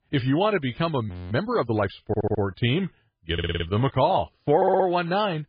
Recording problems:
garbled, watery; badly; nothing above 4.5 kHz
audio freezing; at 1 s
audio stuttering; at 2 s, at 3.5 s and at 4.5 s

